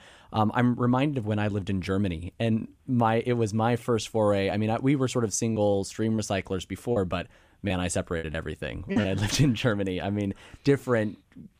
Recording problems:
choppy; very; from 5.5 to 9 s; 8% of the speech affected

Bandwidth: 15 kHz